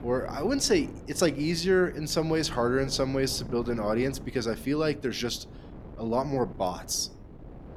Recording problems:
wind noise on the microphone; occasional gusts; 20 dB below the speech

